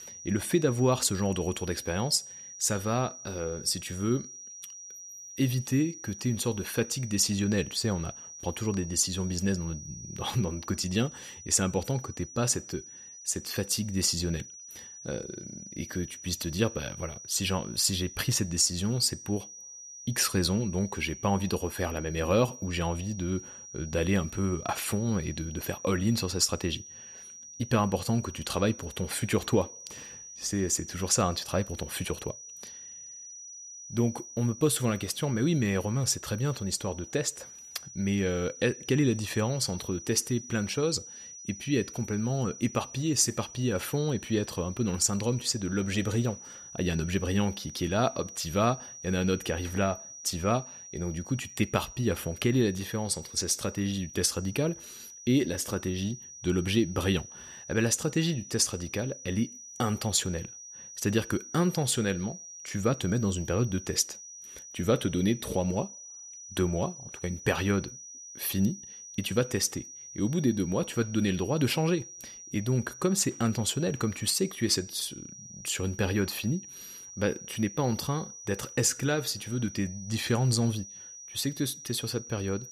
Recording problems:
high-pitched whine; noticeable; throughout; 6 kHz, 15 dB below the speech

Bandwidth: 14.5 kHz